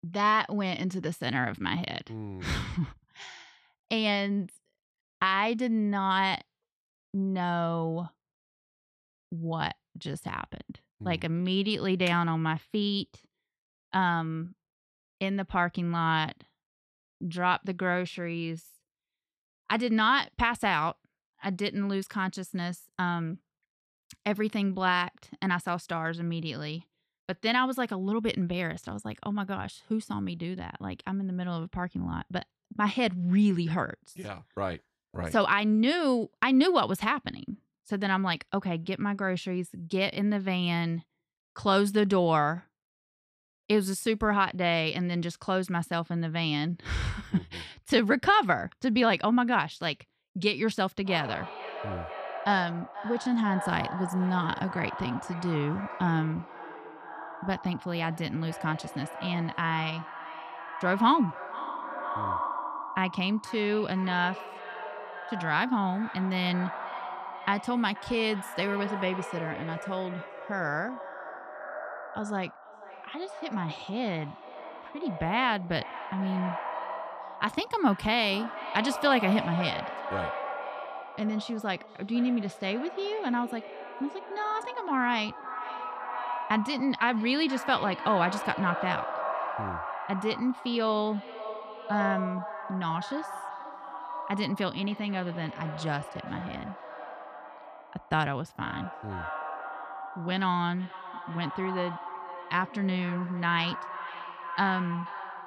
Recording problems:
echo of what is said; strong; from 51 s on; 480 ms later, 9 dB below the speech

